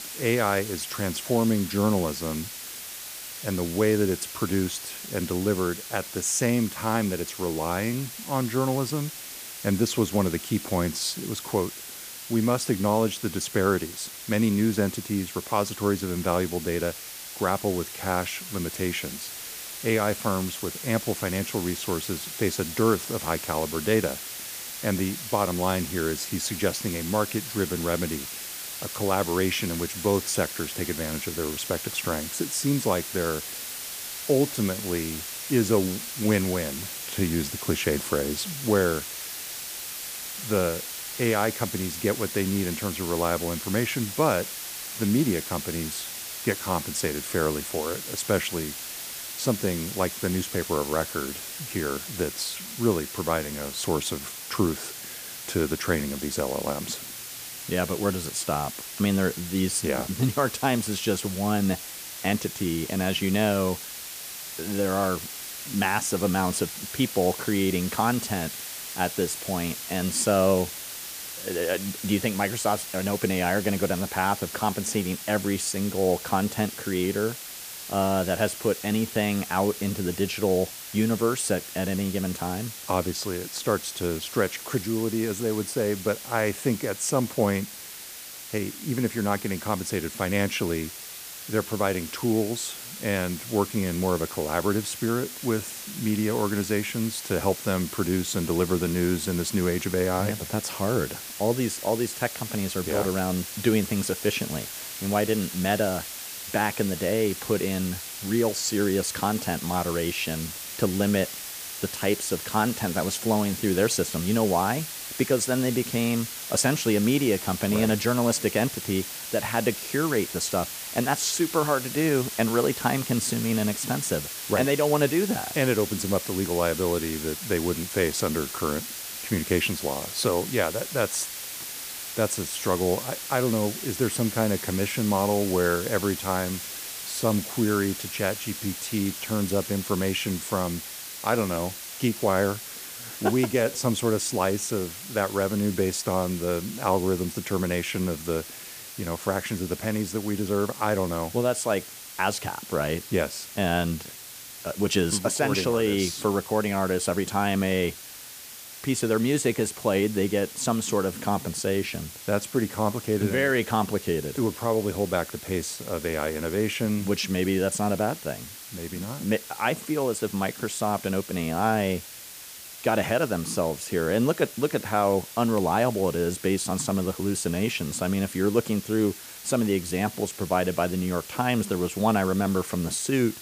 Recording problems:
hiss; loud; throughout; 8 dB below the speech

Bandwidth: 15 kHz